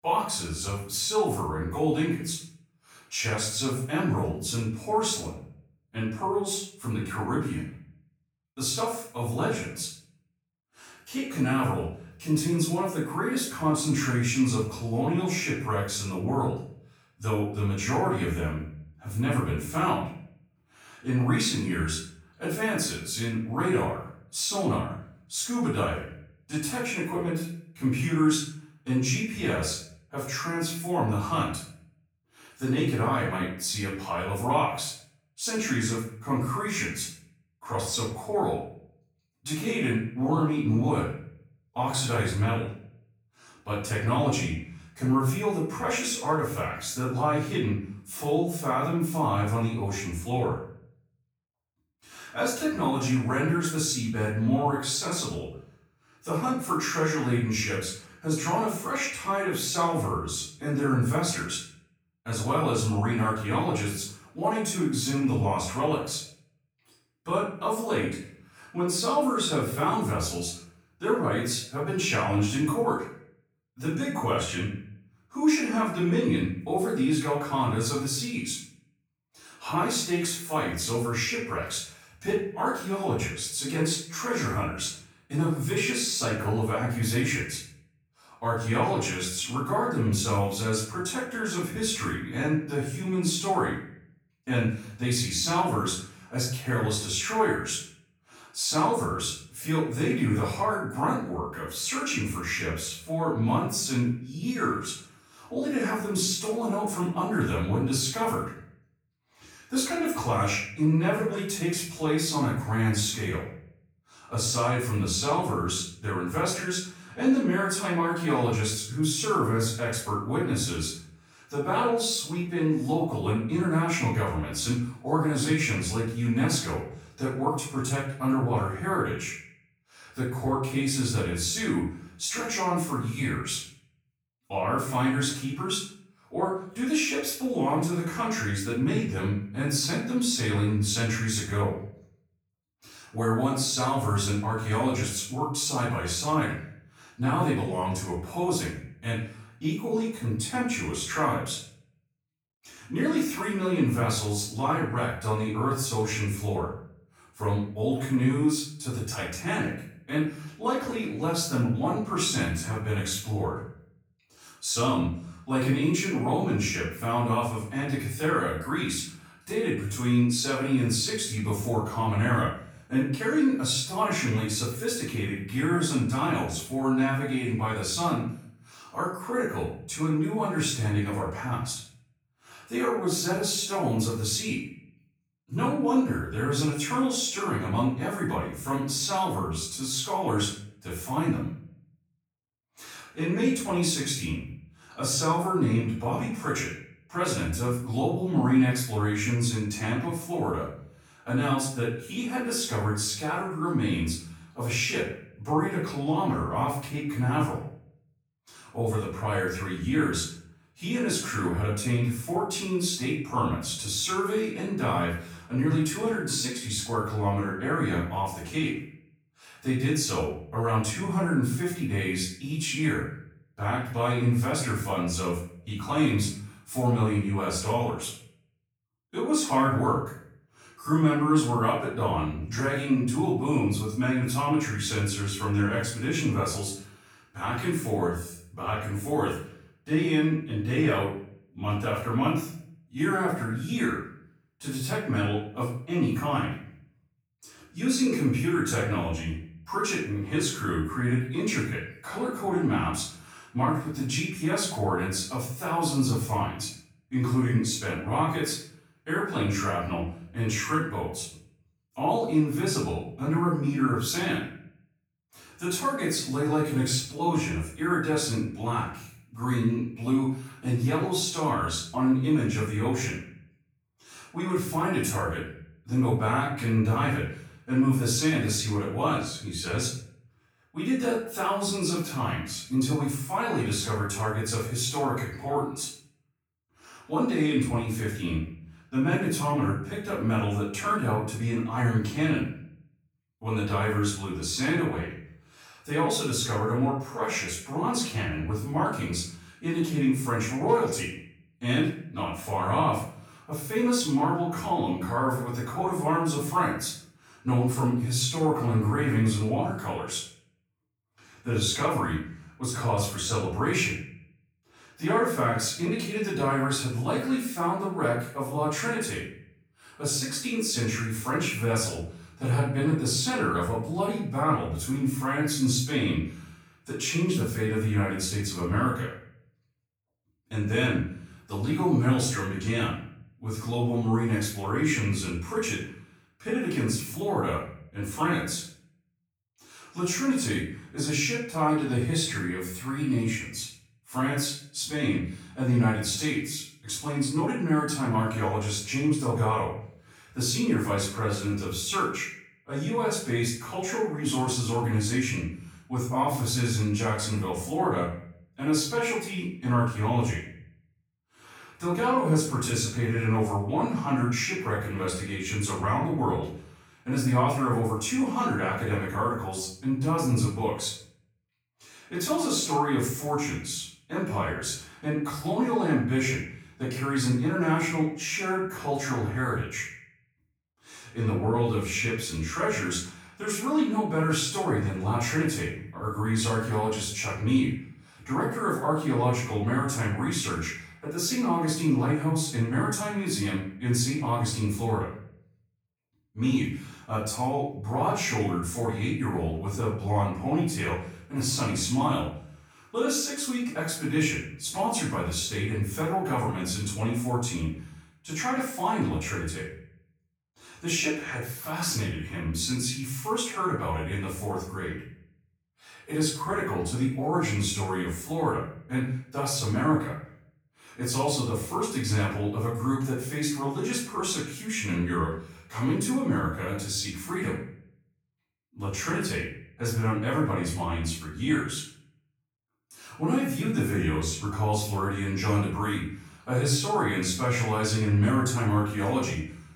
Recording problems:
off-mic speech; far
room echo; noticeable; dies away in 0.5 s

